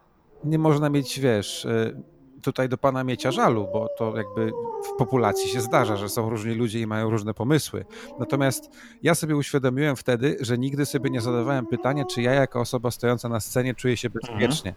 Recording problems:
animal sounds; loud; throughout; 9 dB below the speech

